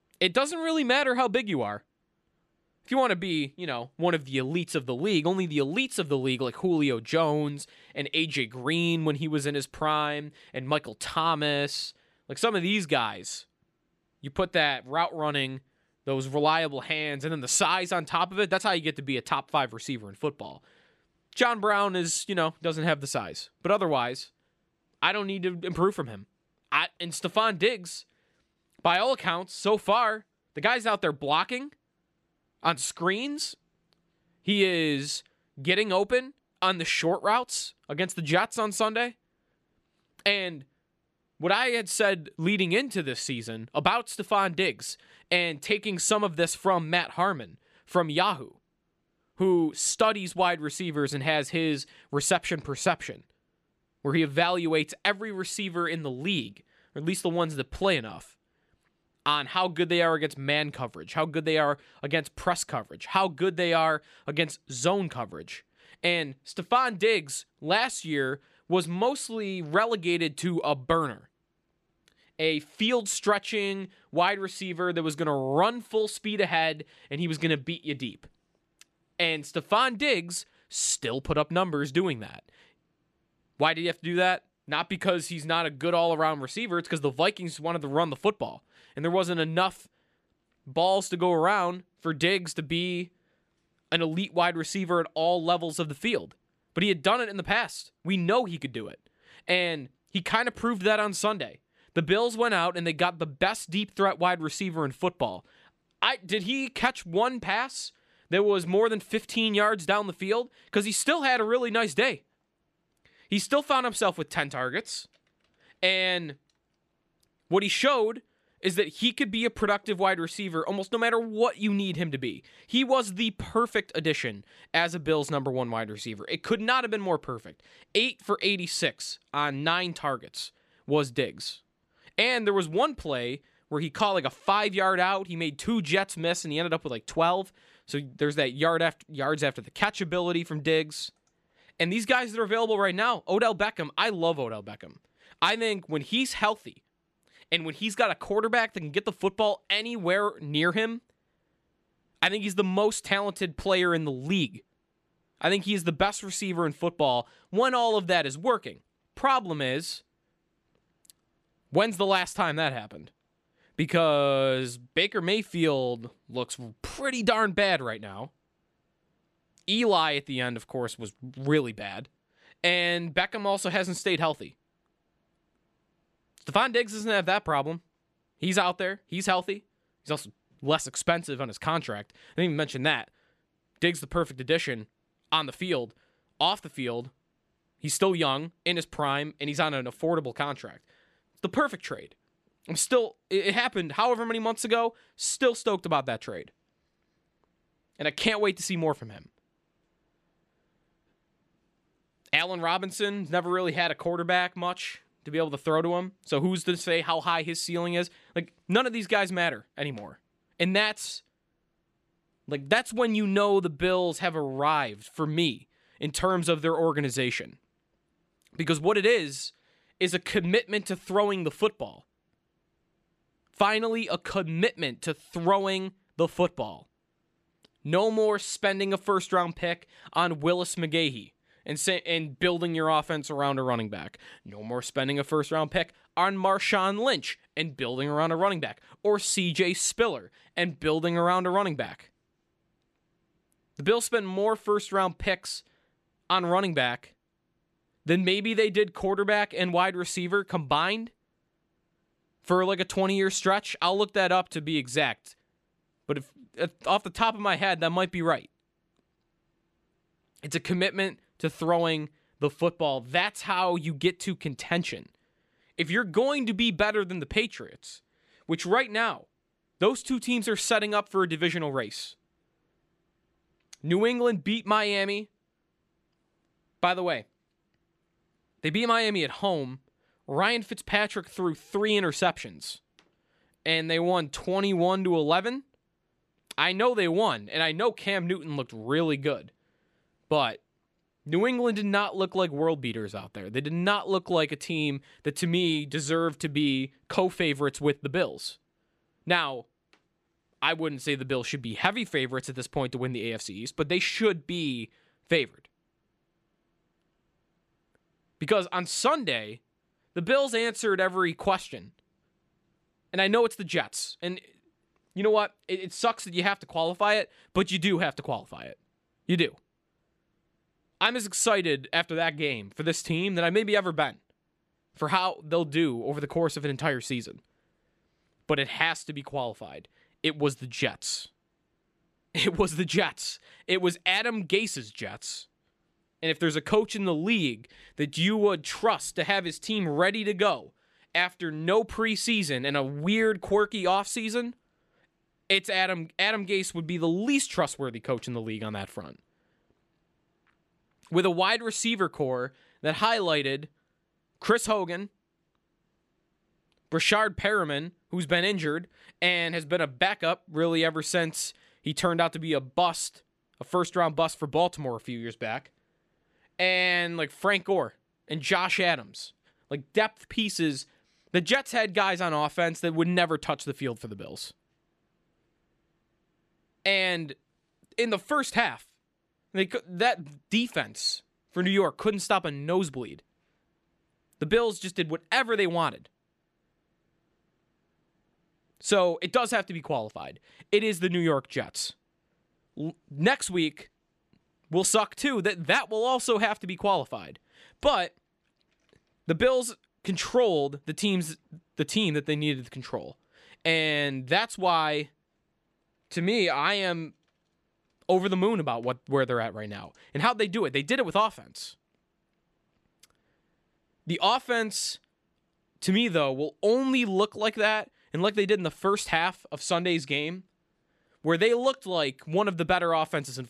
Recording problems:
none

